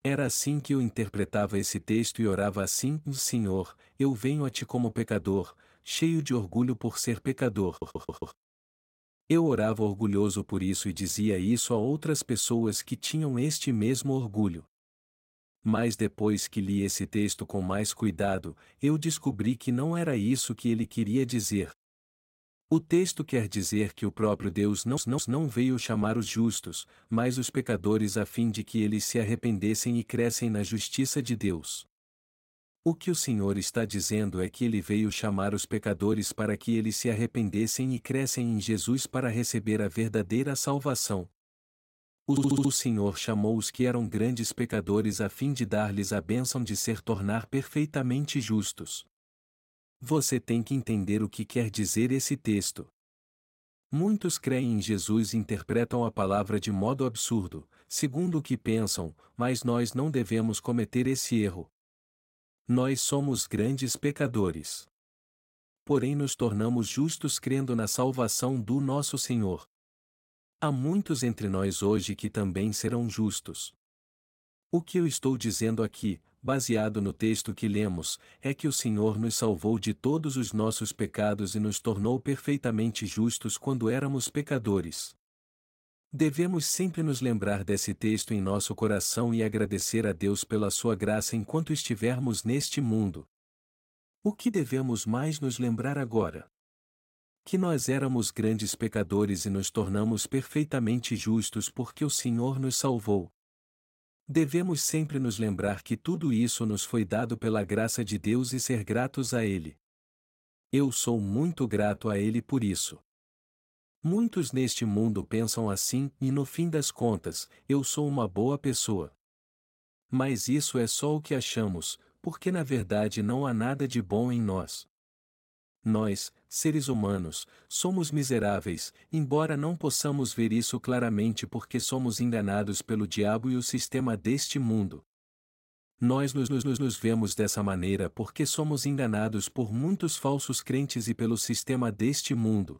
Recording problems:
audio stuttering; 4 times, first at 7.5 s

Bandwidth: 16 kHz